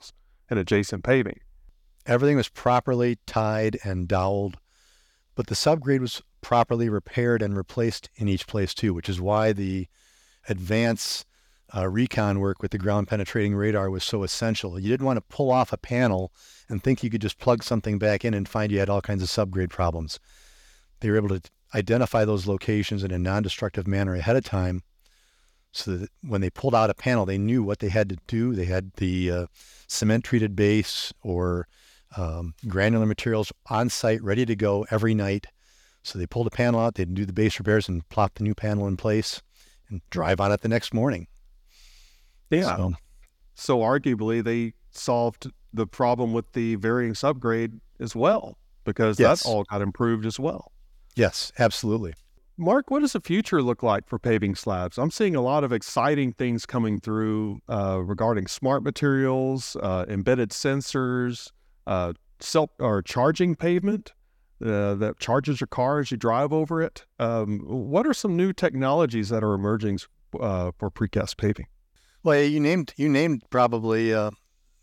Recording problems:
none

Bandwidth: 17 kHz